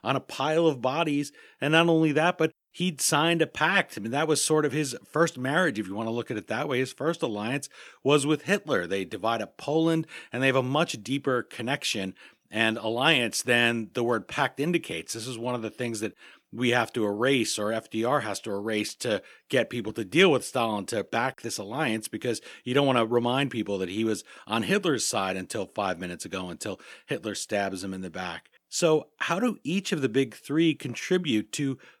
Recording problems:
none

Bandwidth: 19 kHz